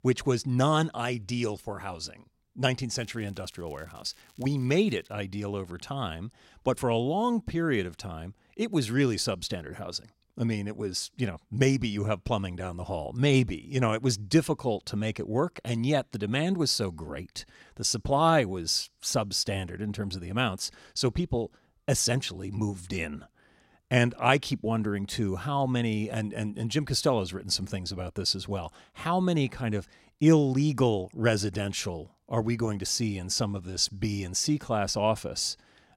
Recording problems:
crackling; faint; from 3 to 5 s; 30 dB below the speech

